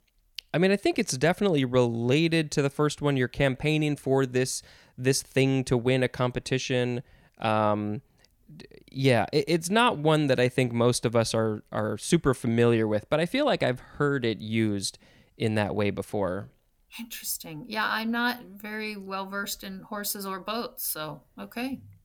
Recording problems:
none

